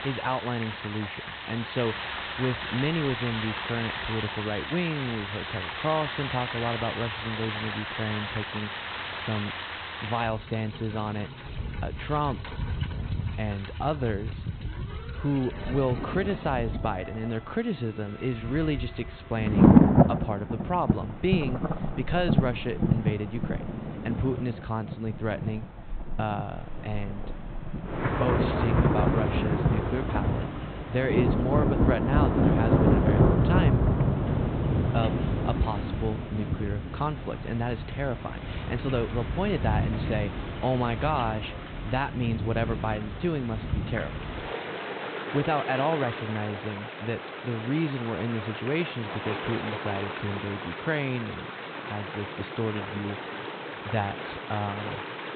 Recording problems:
high frequencies cut off; severe; nothing above 4 kHz
rain or running water; very loud; throughout; 2 dB above the speech

